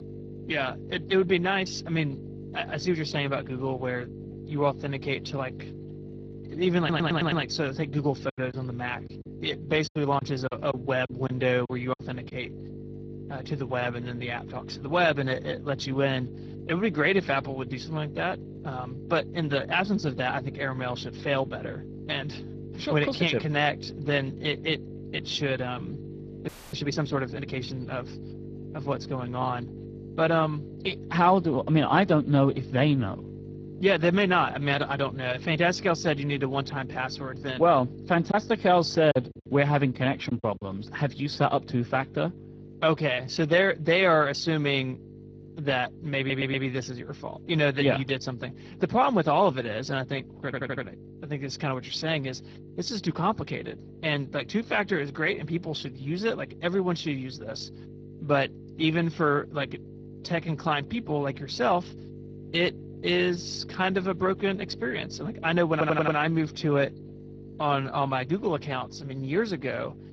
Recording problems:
garbled, watery; badly
electrical hum; noticeable; throughout; 50 Hz, 20 dB below the speech
audio stuttering; 4 times, first at 7 s
choppy; very; from 8.5 to 12 s and from 38 to 41 s; 10% of the speech affected
audio freezing; at 26 s

